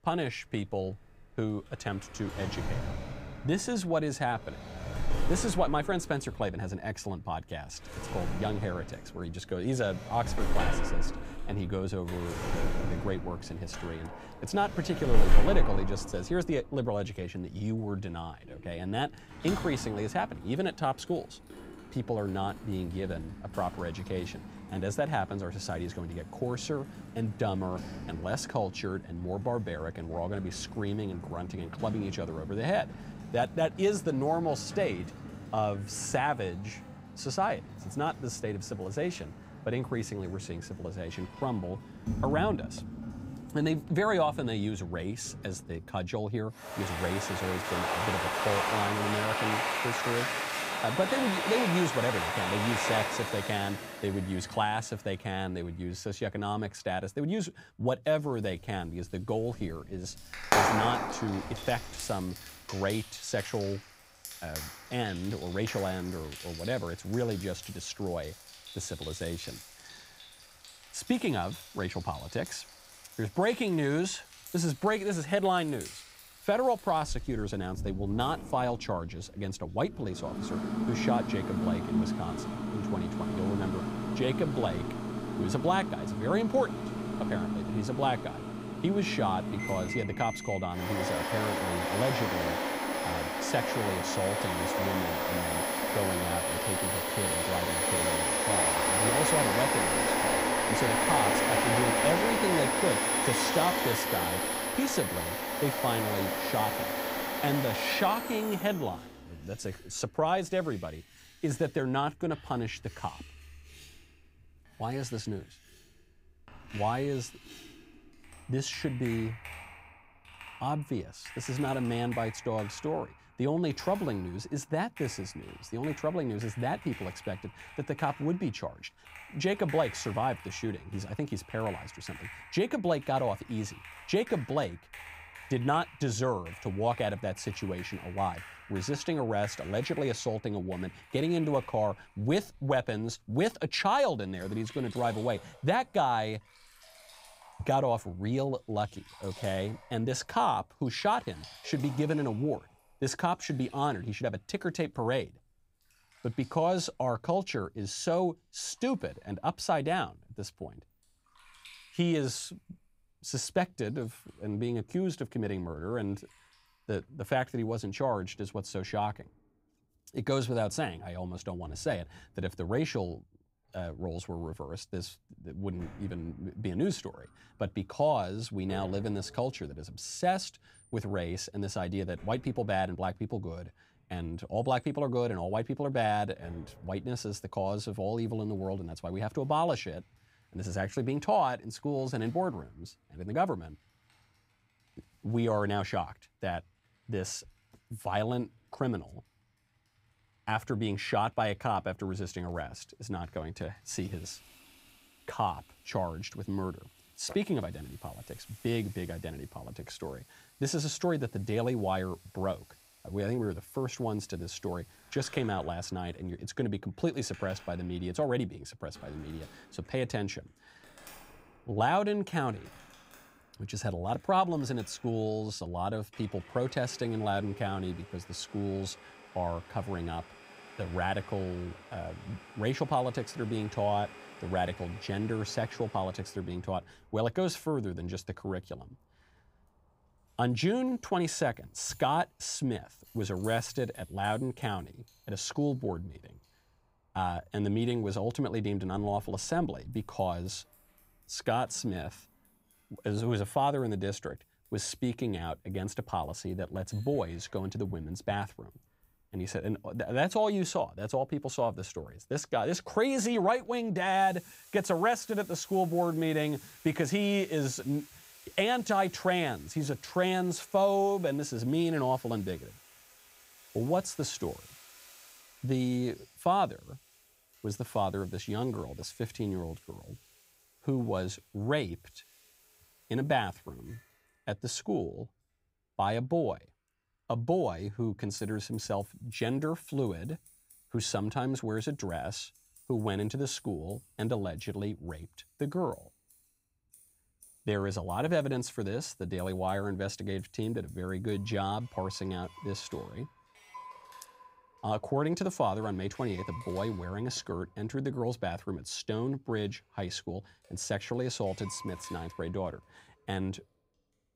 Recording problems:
household noises; loud; throughout; 2 dB below the speech

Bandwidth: 15.5 kHz